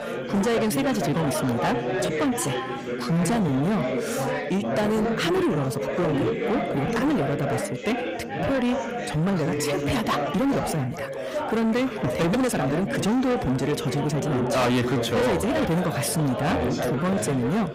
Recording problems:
distortion; heavy; 7 dB below the speech
chatter from many people; loud; throughout; 3 dB below the speech
uneven, jittery; strongly; from 1 to 17 s

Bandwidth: 15.5 kHz